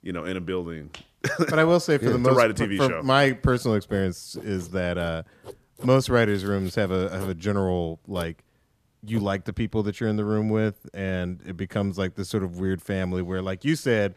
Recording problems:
household noises; faint; from 3 s on; 20 dB below the speech

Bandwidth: 14.5 kHz